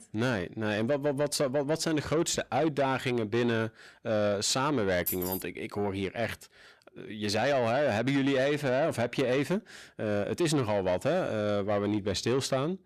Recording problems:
distortion; slight; 10 dB below the speech
jangling keys; noticeable; at 5 s; peak 3 dB below the speech

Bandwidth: 14 kHz